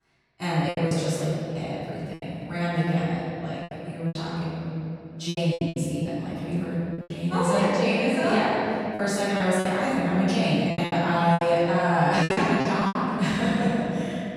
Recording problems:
room echo; strong; dies away in 2.9 s
off-mic speech; far
choppy; very; 10% of the speech affected

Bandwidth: 18 kHz